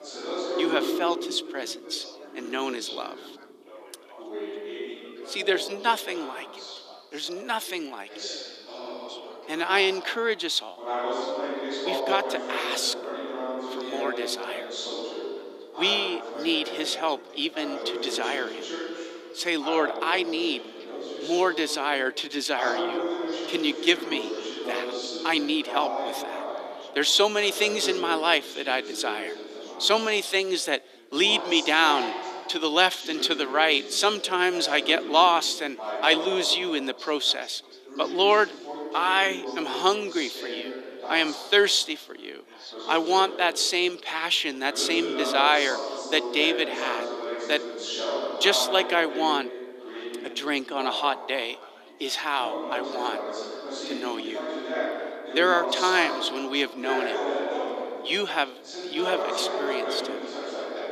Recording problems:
thin; somewhat; fading below 300 Hz
background chatter; loud; throughout; 4 voices, 8 dB below the speech

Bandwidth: 14.5 kHz